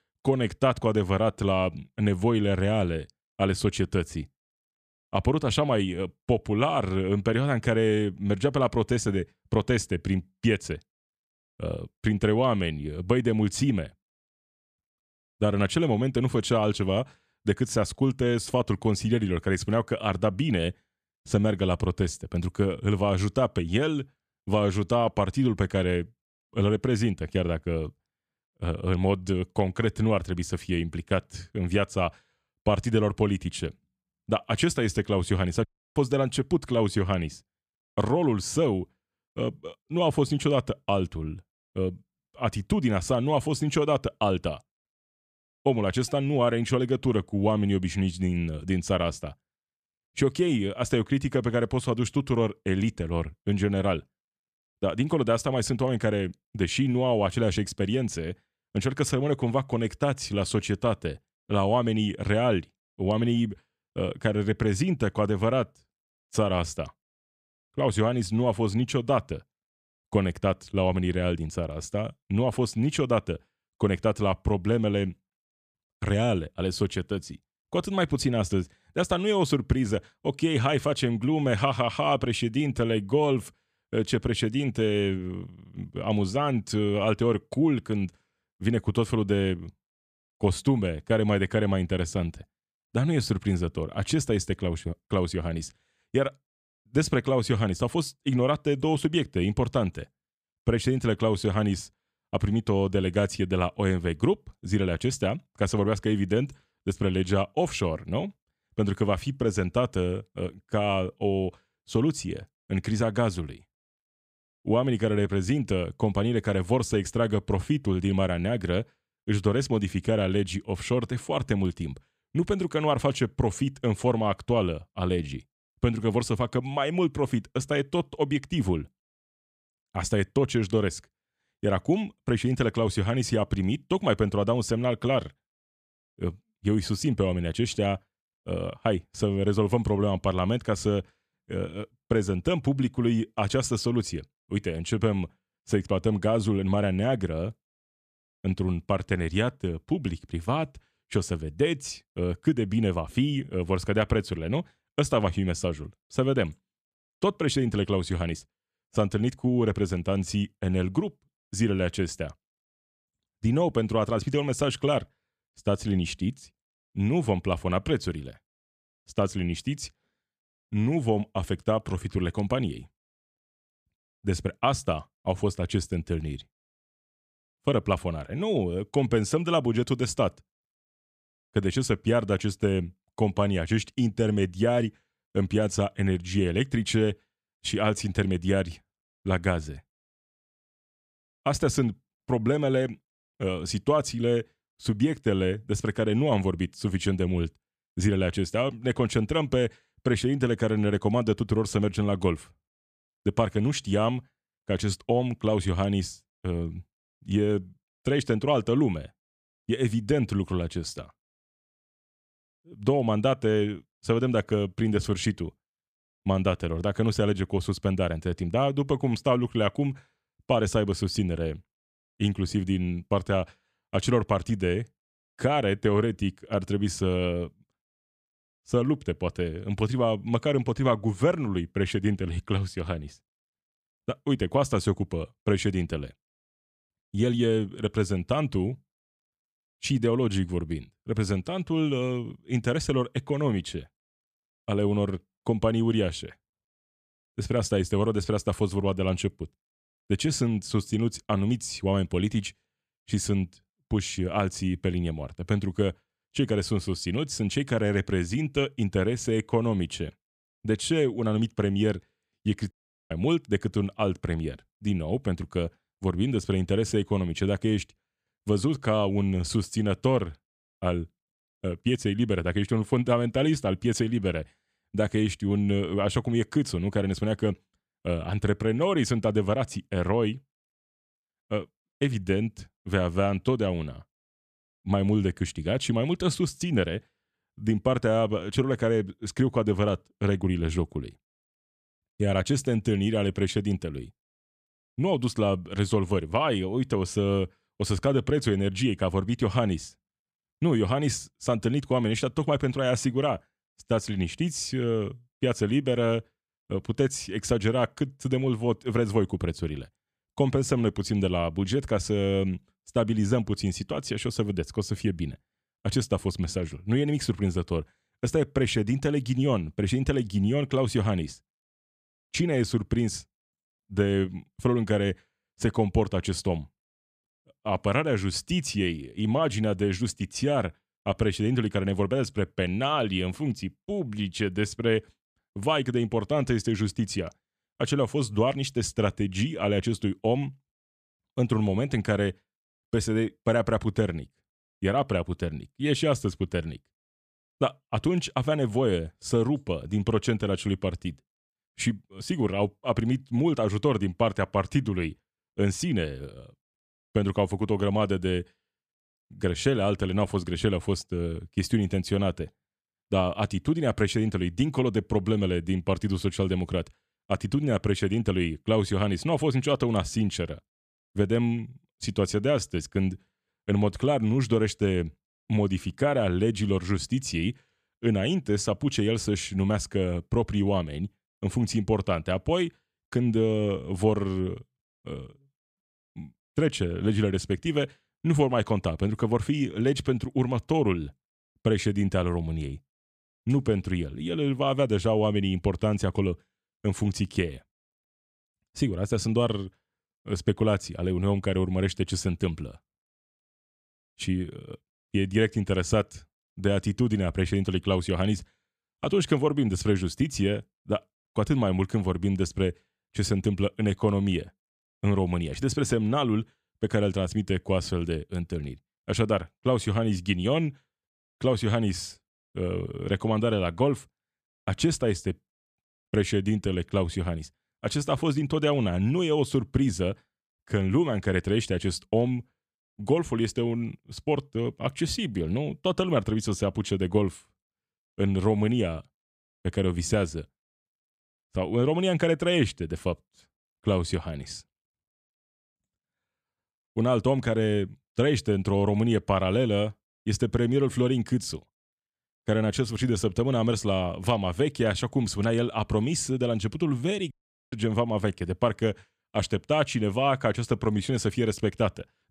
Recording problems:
audio cutting out; at 36 s, at 4:23 and at 7:37

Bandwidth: 14.5 kHz